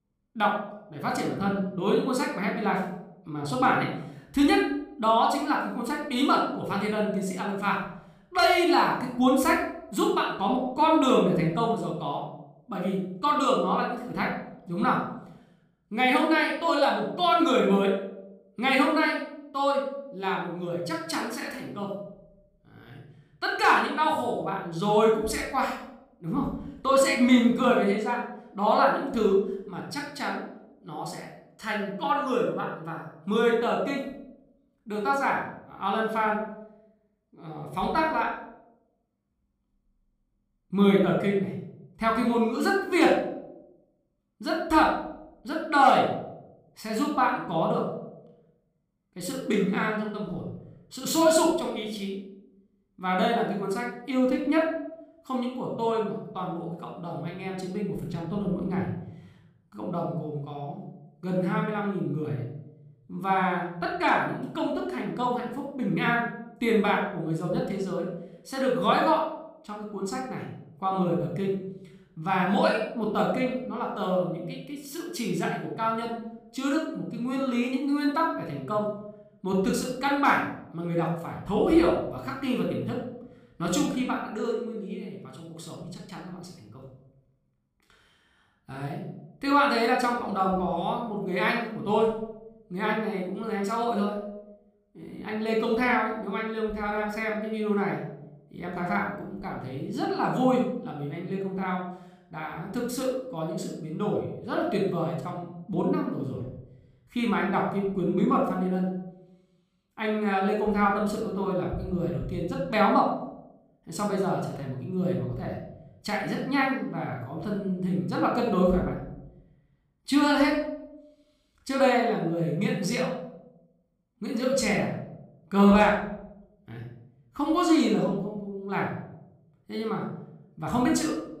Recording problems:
room echo; noticeable; dies away in 0.7 s
off-mic speech; somewhat distant

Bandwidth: 15 kHz